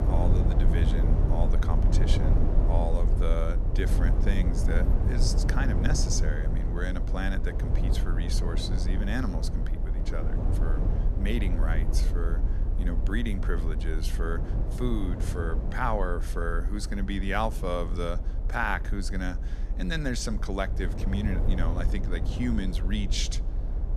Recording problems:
low rumble; loud; throughout; 7 dB below the speech

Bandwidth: 13.5 kHz